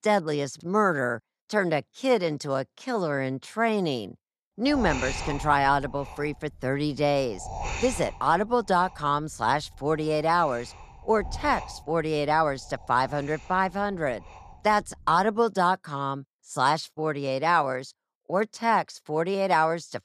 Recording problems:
wind noise on the microphone; occasional gusts; from 4.5 to 15 s; 15 dB below the speech

